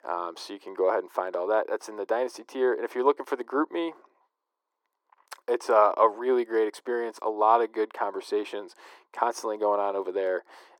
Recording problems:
thin; very; fading below 350 Hz
muffled; slightly; fading above 2 kHz

